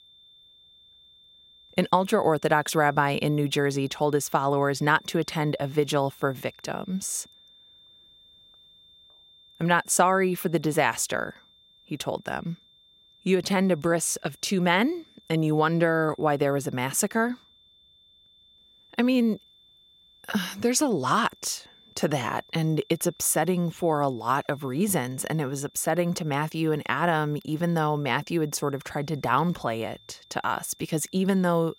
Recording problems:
high-pitched whine; faint; throughout; 3.5 kHz, 30 dB below the speech

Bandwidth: 16 kHz